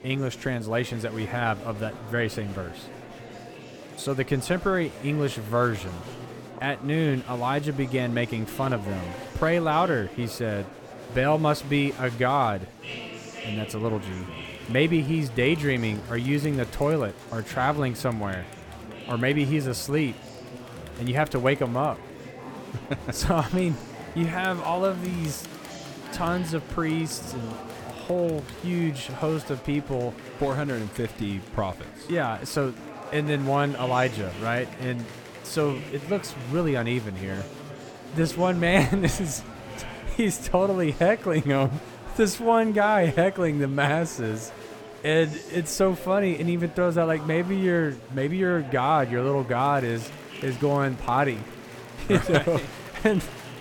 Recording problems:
murmuring crowd; noticeable; throughout; 15 dB below the speech

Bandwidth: 18 kHz